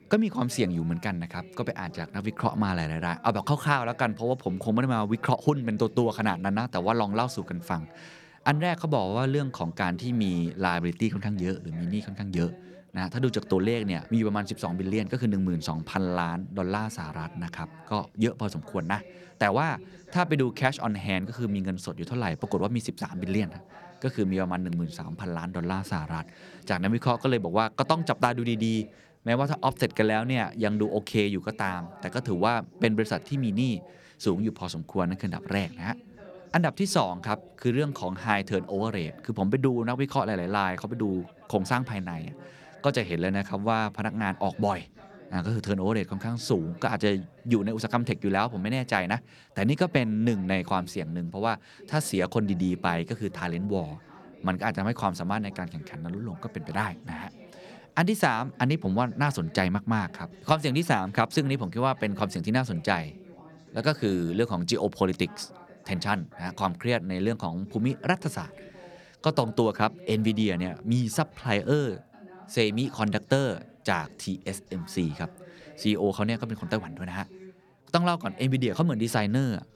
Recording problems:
background chatter; faint; throughout; 3 voices, 20 dB below the speech

